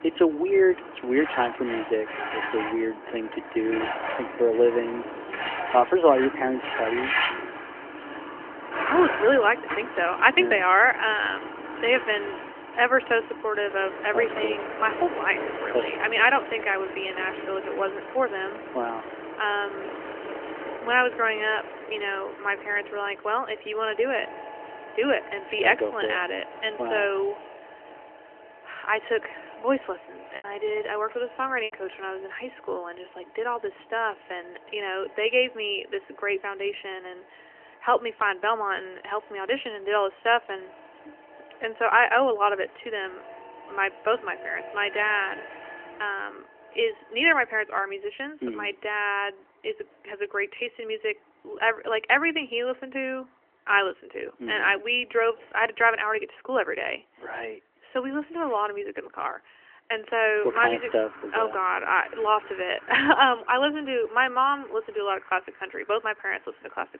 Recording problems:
phone-call audio; nothing above 3 kHz
traffic noise; loud; throughout; 10 dB below the speech
choppy; occasionally; from 30 to 32 s; 3% of the speech affected

